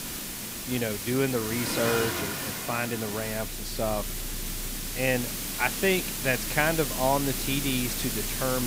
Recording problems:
hiss; loud; throughout; 3 dB below the speech
traffic noise; noticeable; throughout; 10 dB below the speech
abrupt cut into speech; at the end

